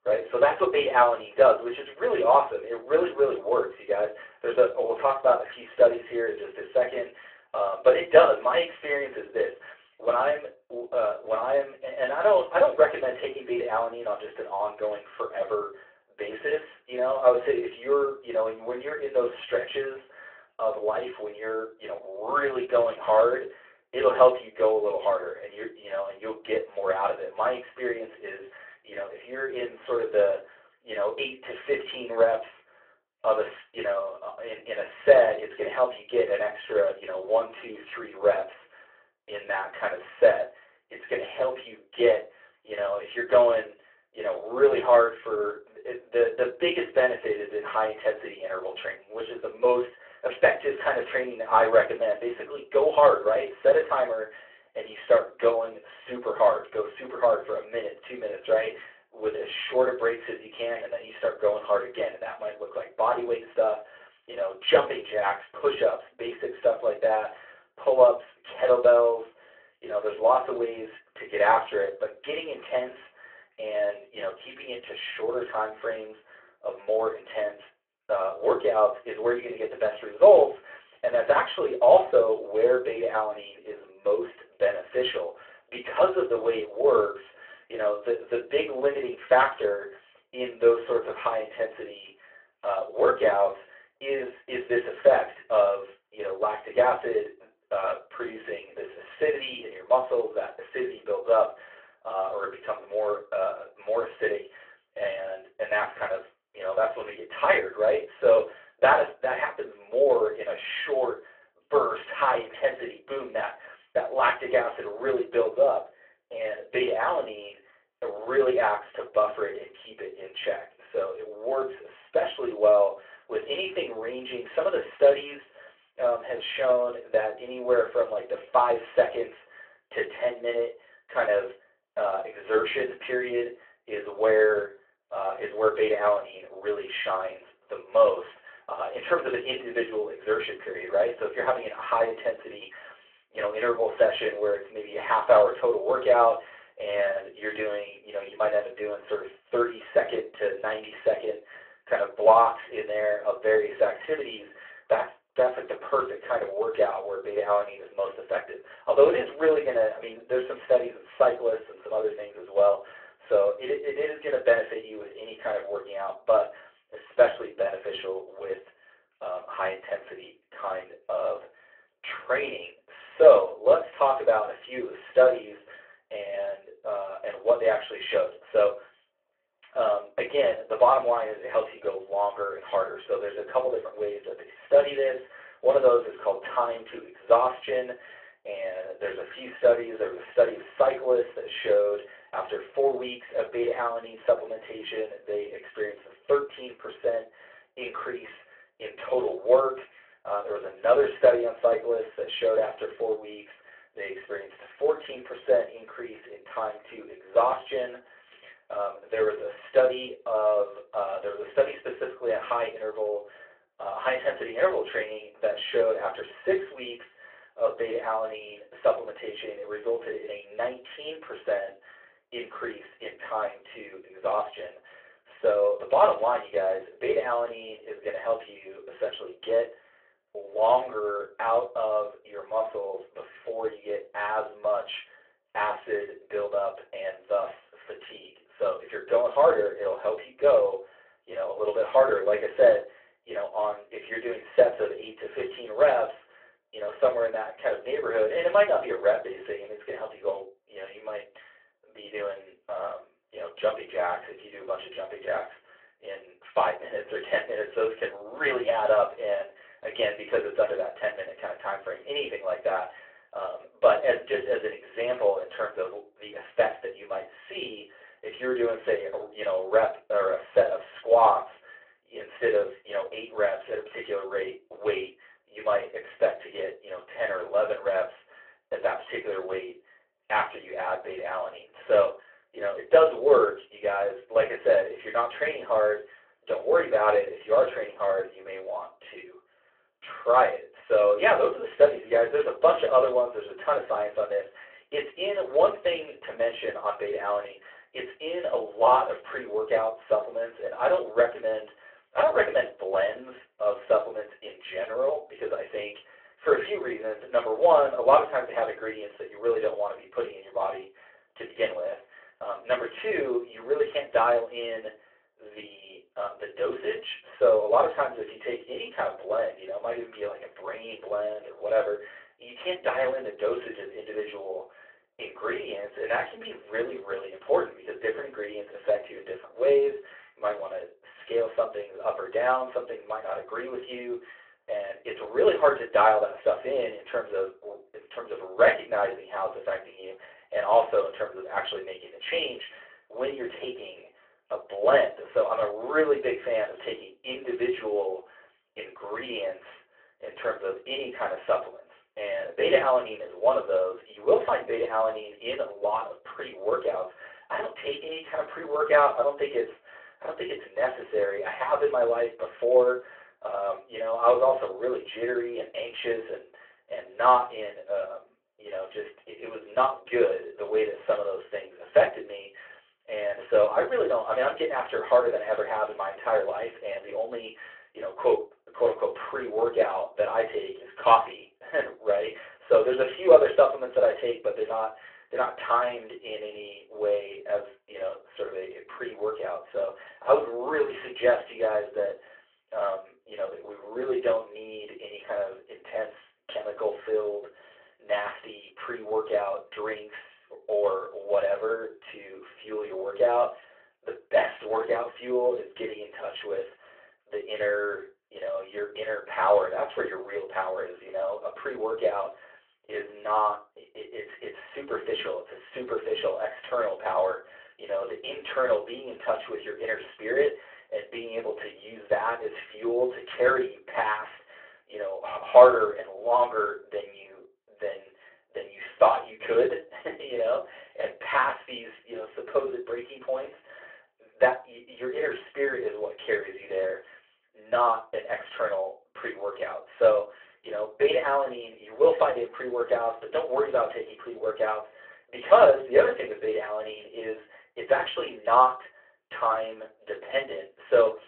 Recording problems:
off-mic speech; far
room echo; slight; dies away in 0.2 s
phone-call audio

